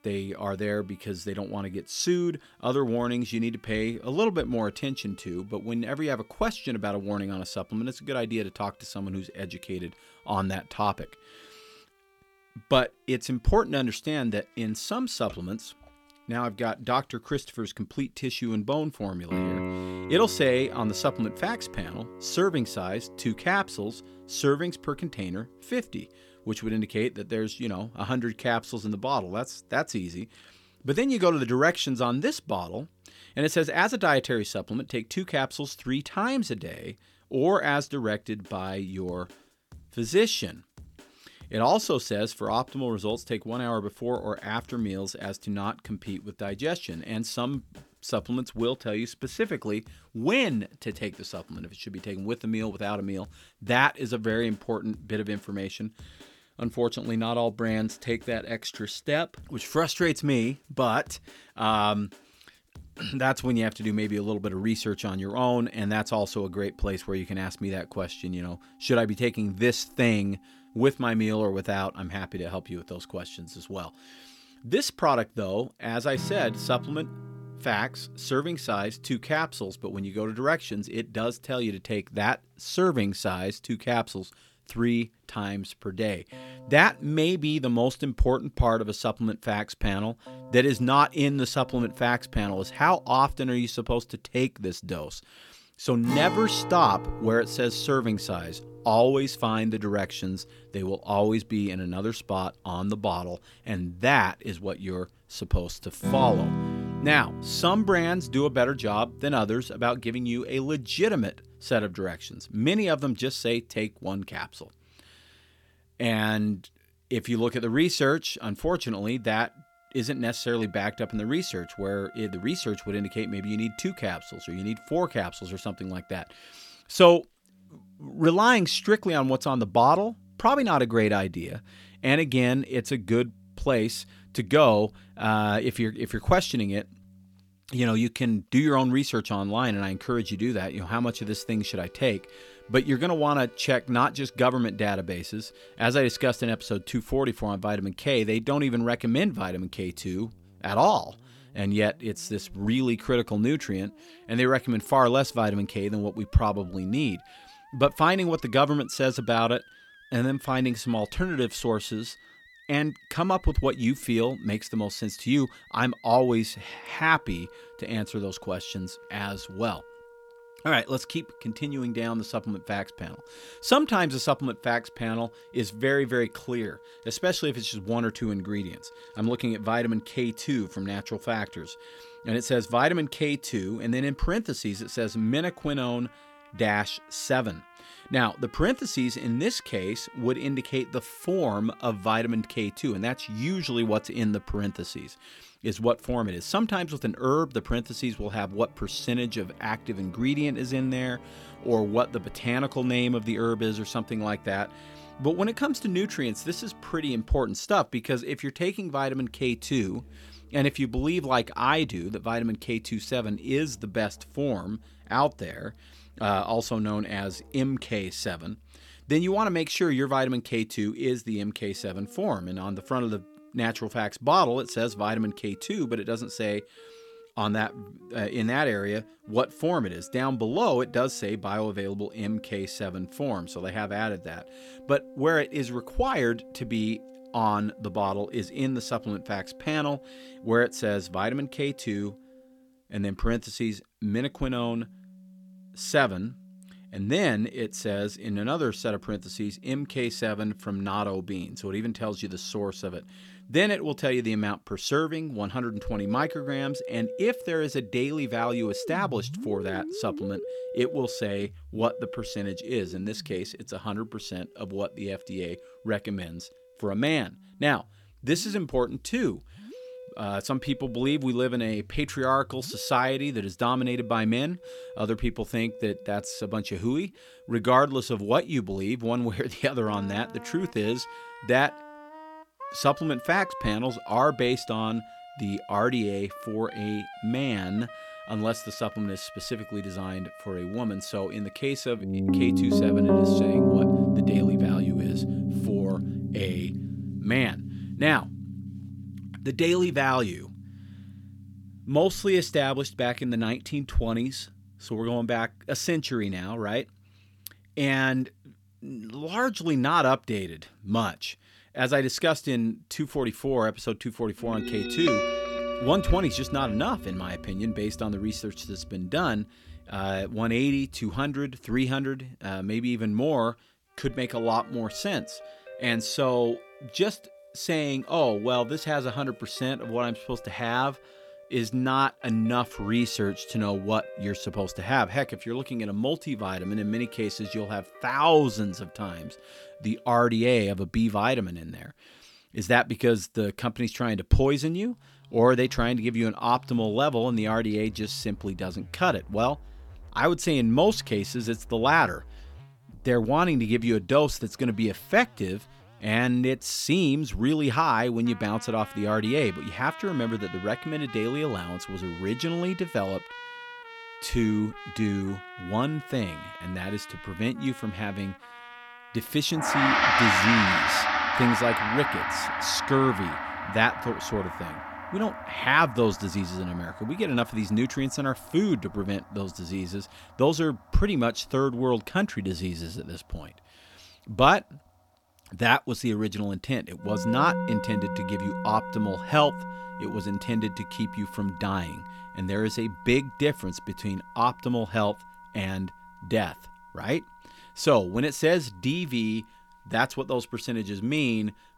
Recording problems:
background music; loud; throughout; 7 dB below the speech

